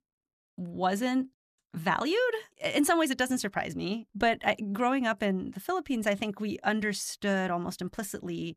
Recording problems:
none

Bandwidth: 14.5 kHz